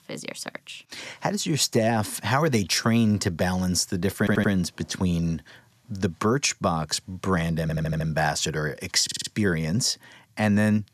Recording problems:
audio stuttering; at 4 s, at 7.5 s and at 9 s

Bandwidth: 14 kHz